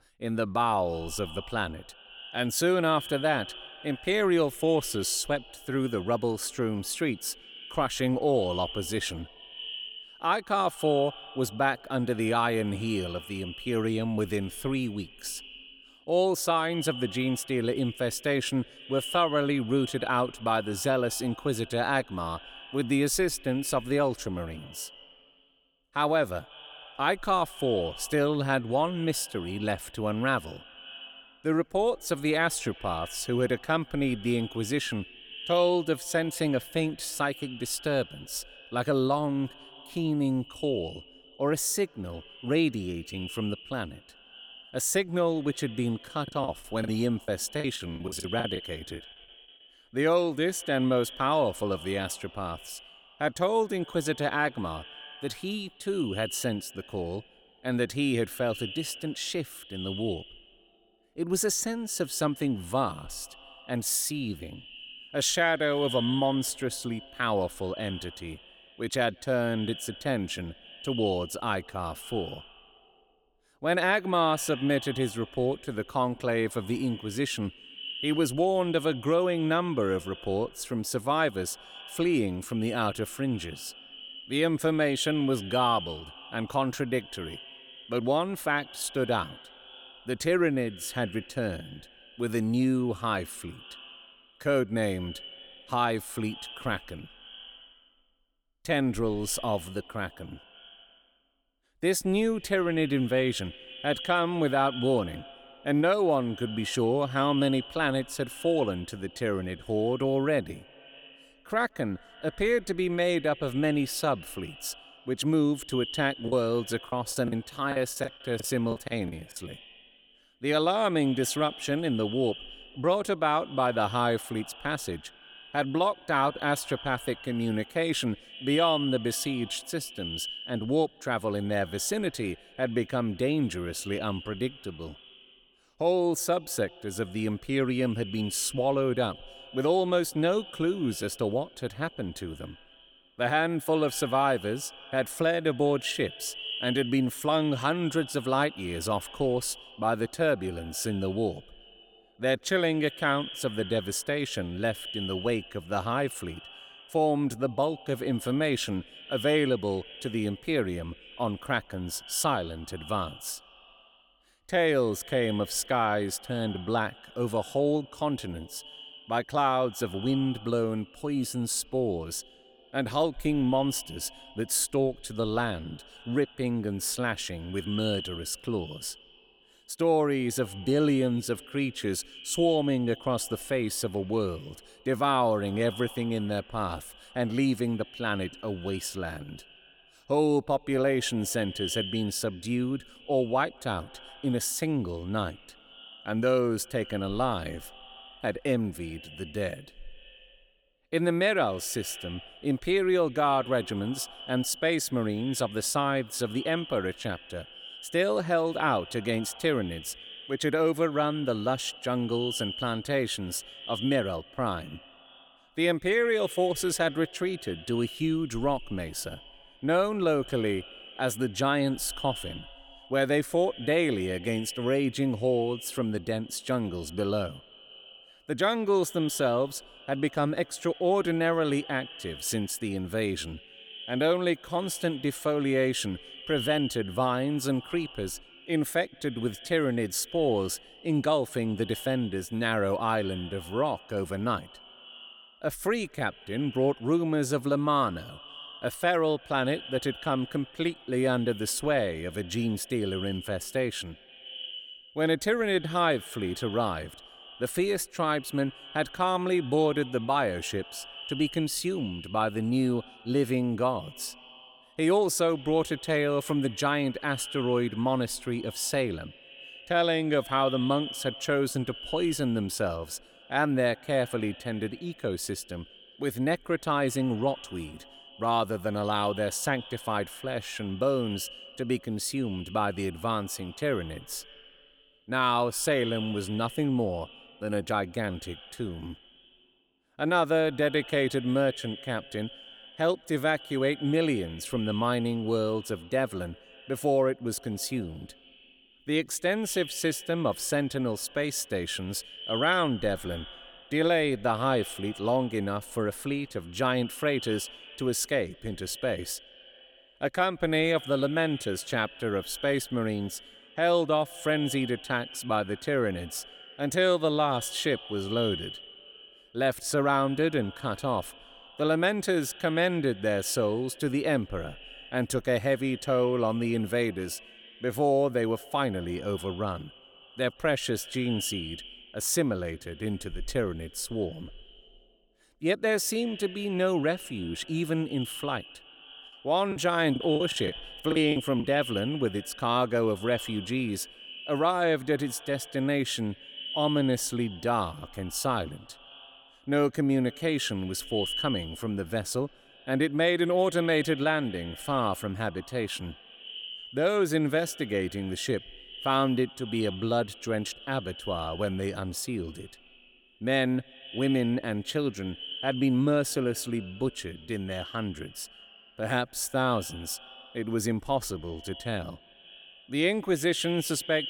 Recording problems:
echo of what is said; noticeable; throughout; 170 ms later, 15 dB below the speech
choppy; very; from 46 to 49 s, from 1:56 to 1:59 and from 5:40 to 5:41; 18% of the speech affected

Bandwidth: 18 kHz